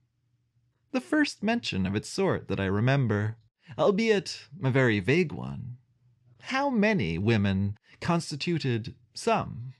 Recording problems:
muffled; slightly; fading above 3 kHz

